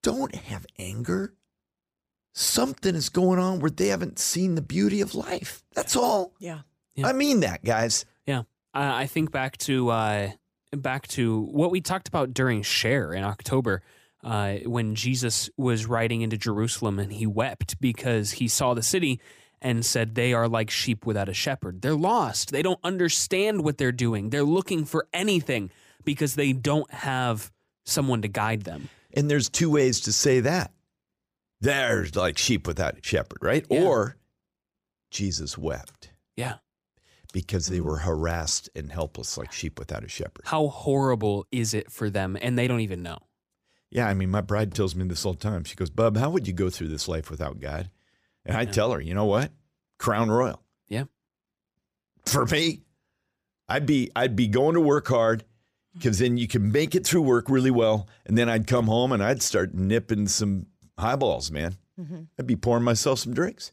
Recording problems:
none

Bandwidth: 15 kHz